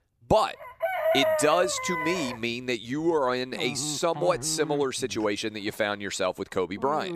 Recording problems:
animal sounds; loud; throughout; 4 dB below the speech

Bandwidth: 14.5 kHz